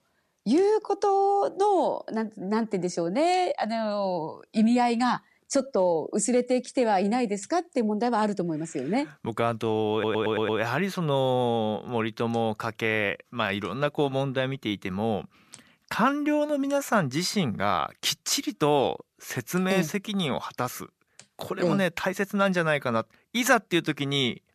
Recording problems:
audio stuttering; at 10 s

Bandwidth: 14 kHz